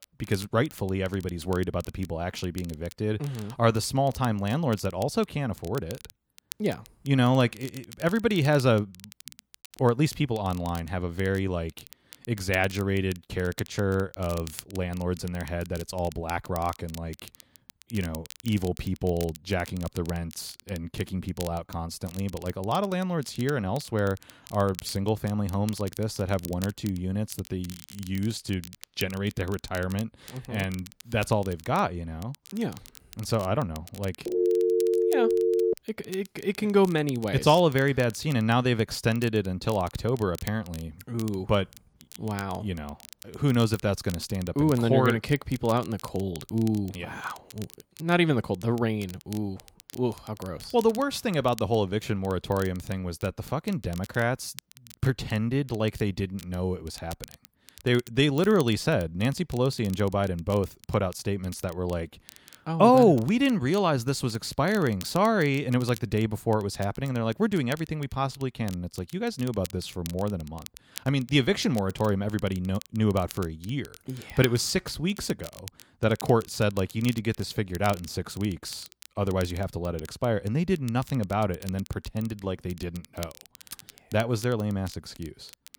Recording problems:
crackle, like an old record; noticeable; 20 dB below the speech
phone ringing; loud; from 34 to 36 s; peak 4 dB above the speech

